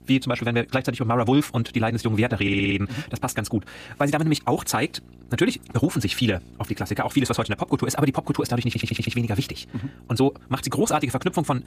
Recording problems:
wrong speed, natural pitch; too fast; 1.5 times normal speed
electrical hum; faint; throughout; 60 Hz, 30 dB below the speech
audio stuttering; at 2.5 s and at 8.5 s

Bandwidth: 15 kHz